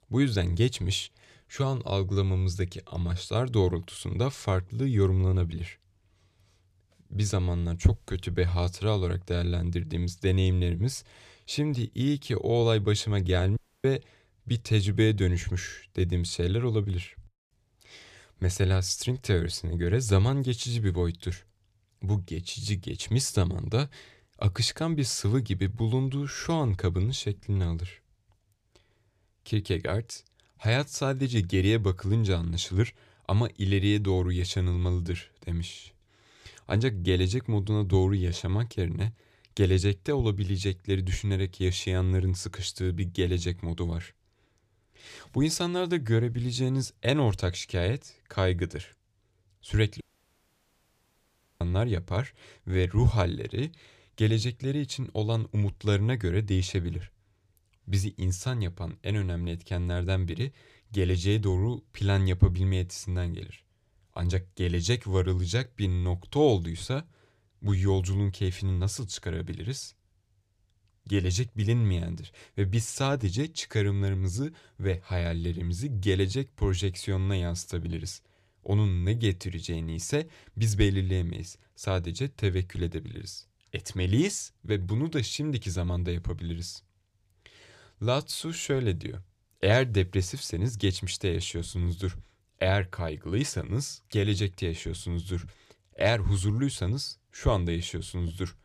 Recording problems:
audio cutting out; at 14 s and at 50 s for 1.5 s

